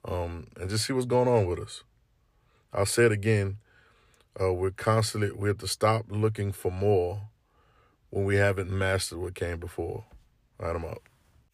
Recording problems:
none

